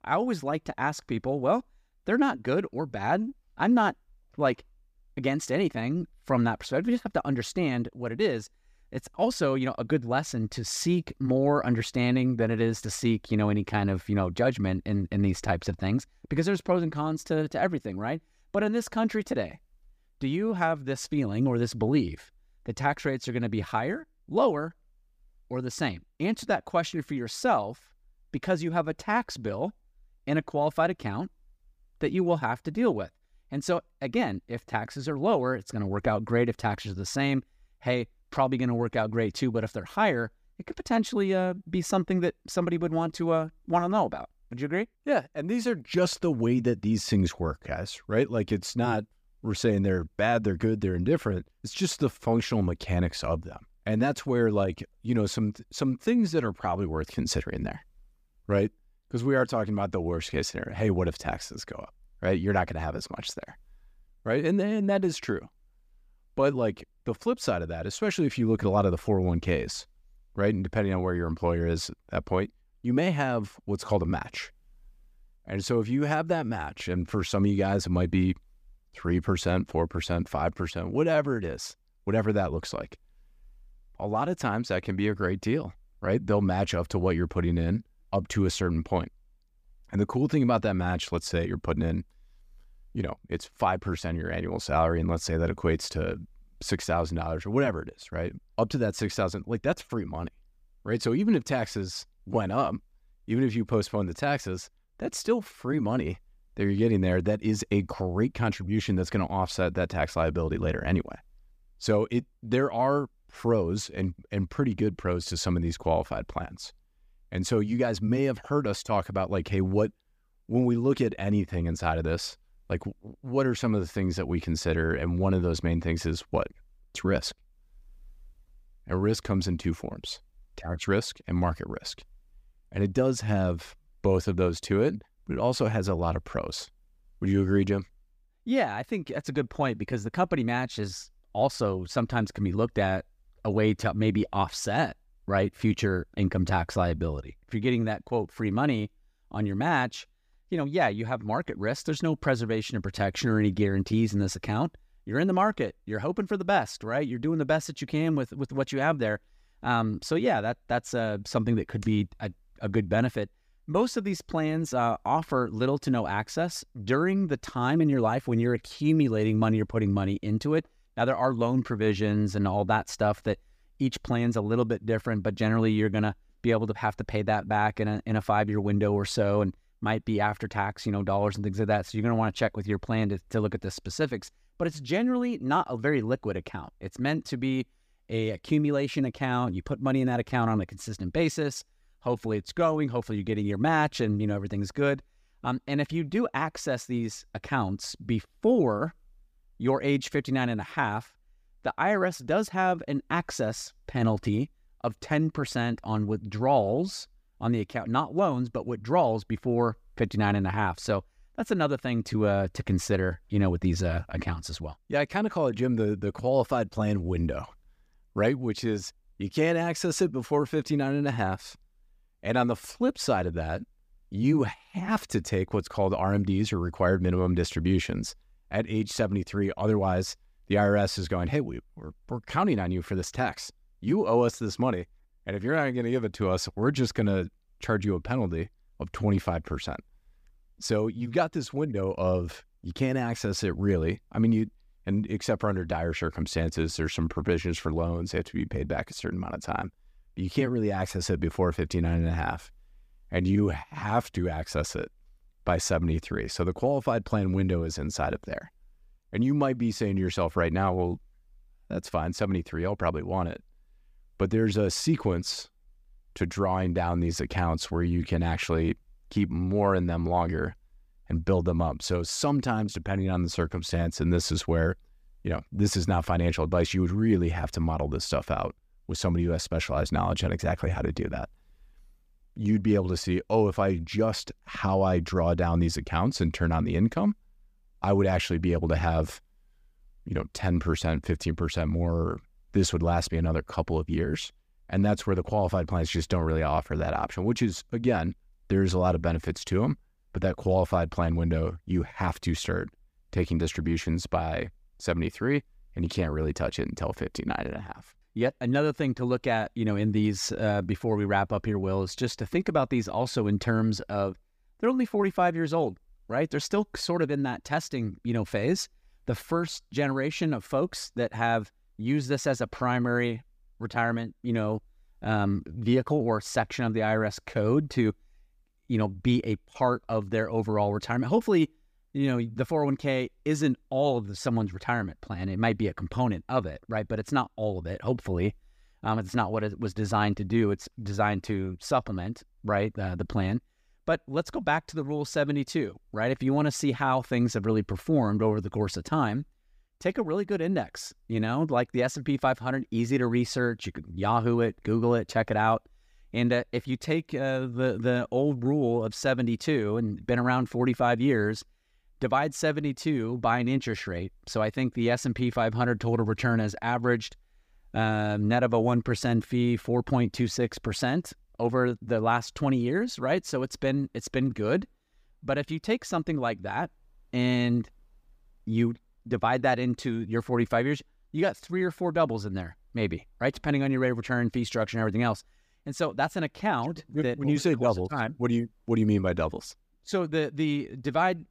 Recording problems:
none

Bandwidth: 15 kHz